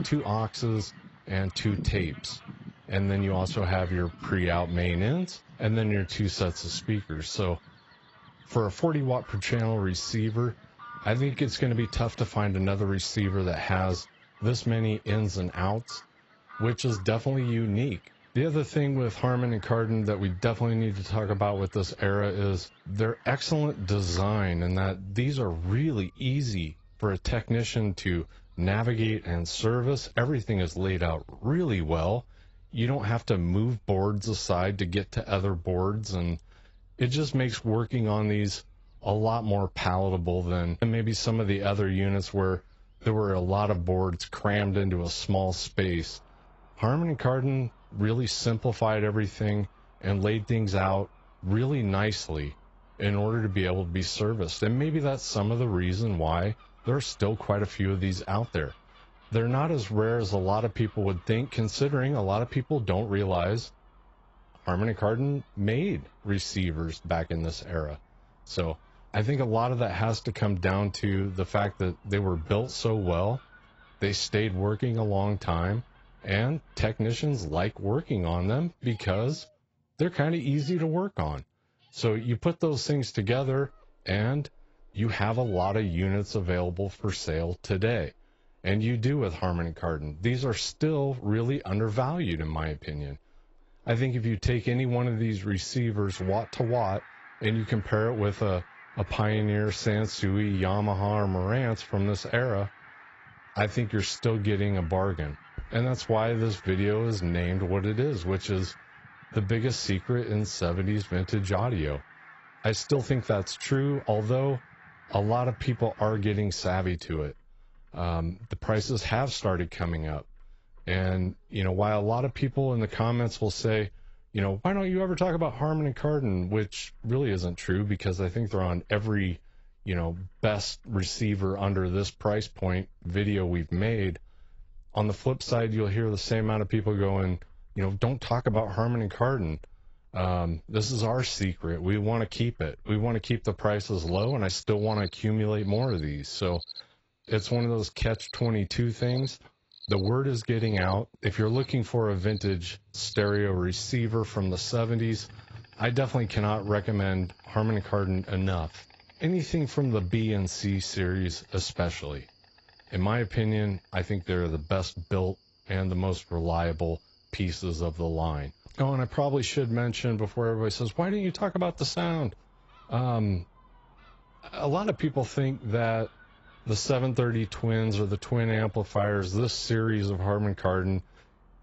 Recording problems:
garbled, watery; badly; nothing above 8 kHz
animal sounds; faint; throughout; 25 dB below the speech

